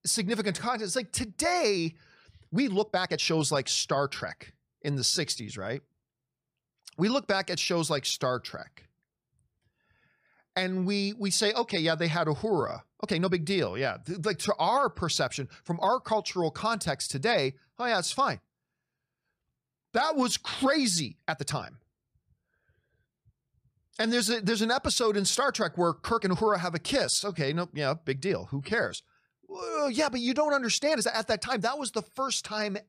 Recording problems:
uneven, jittery; strongly; from 0.5 to 32 s

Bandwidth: 14.5 kHz